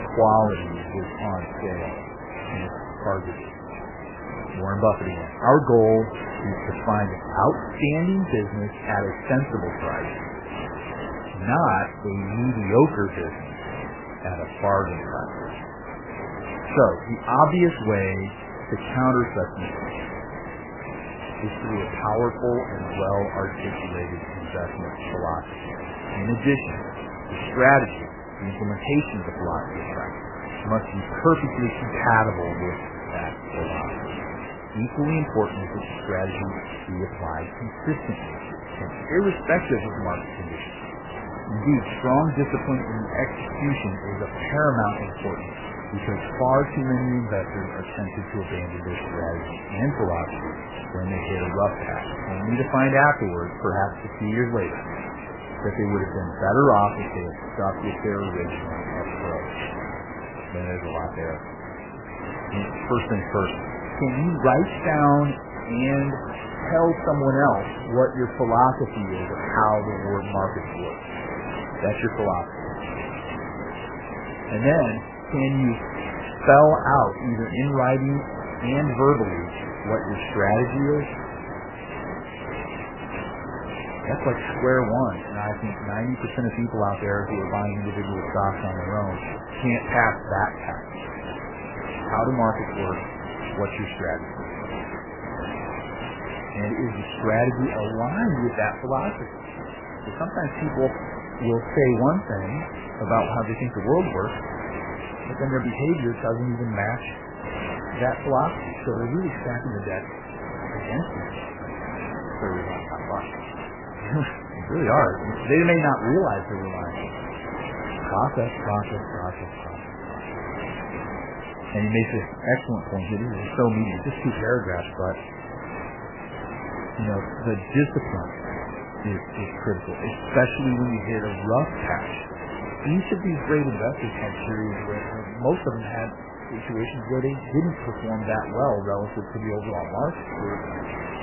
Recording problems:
garbled, watery; badly; nothing above 3 kHz
hiss; loud; throughout; 9 dB below the speech

